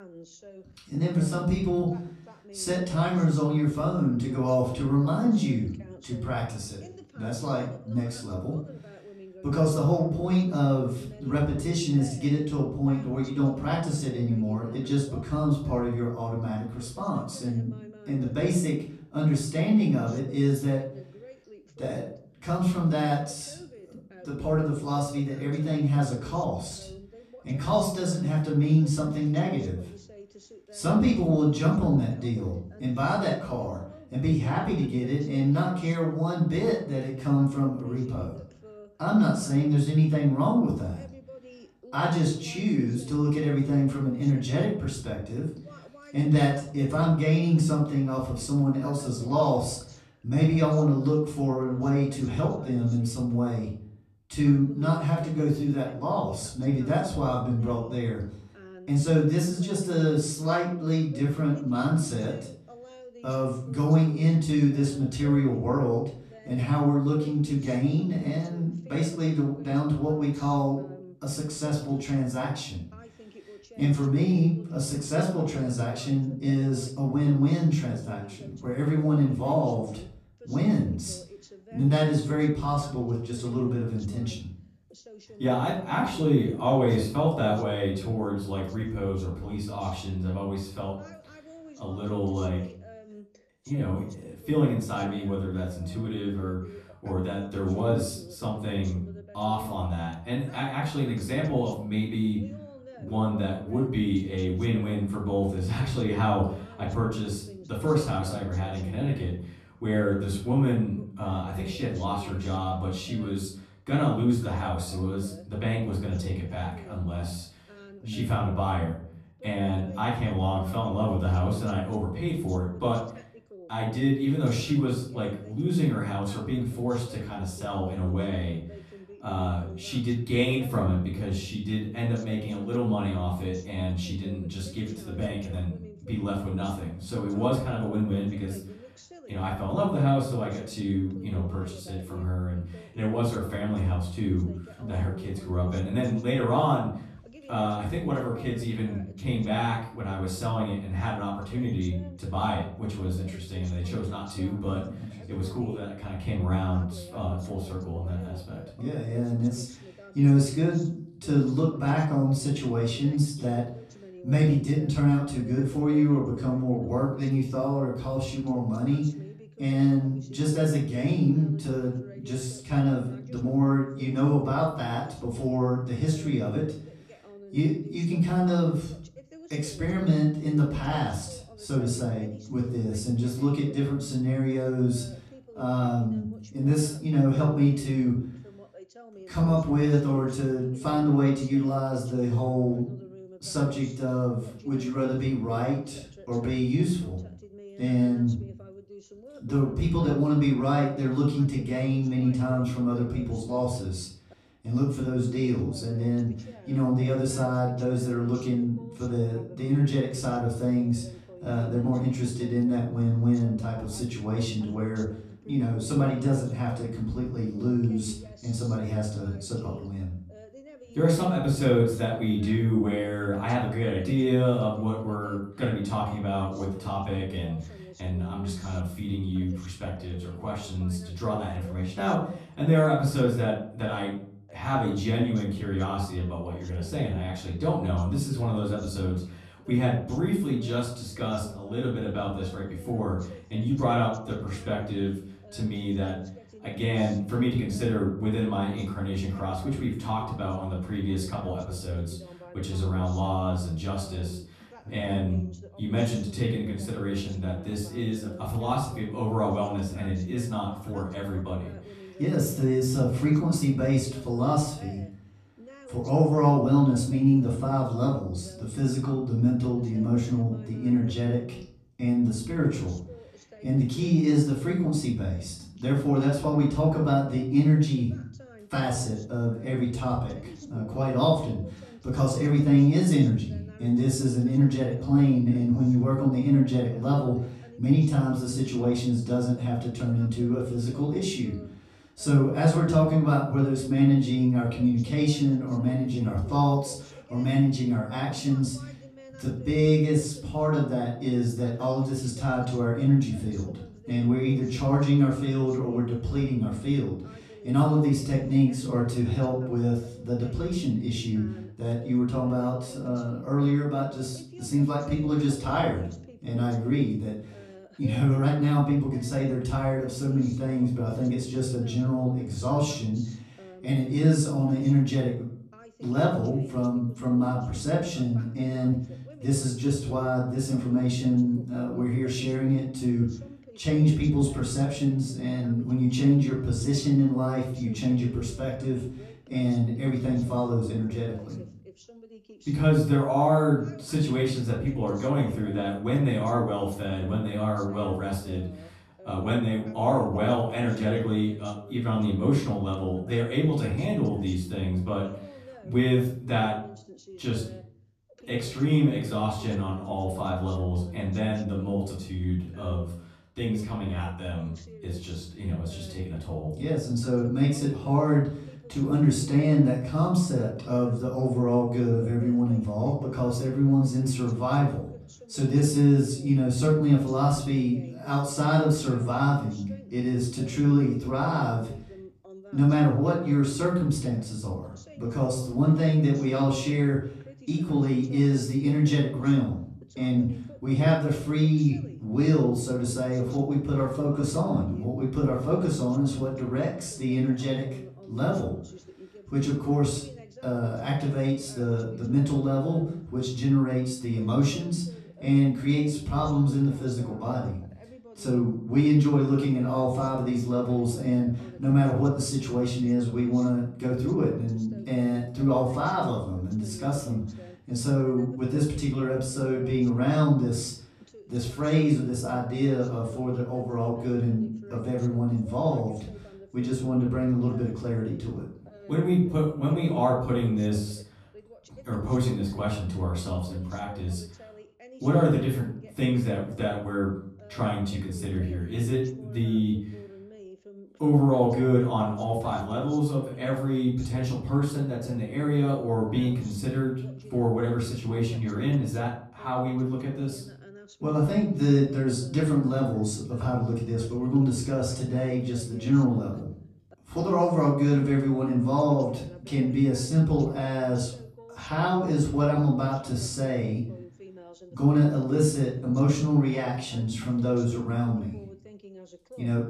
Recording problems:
off-mic speech; far
room echo; slight; dies away in 0.5 s
voice in the background; faint; throughout; 20 dB below the speech

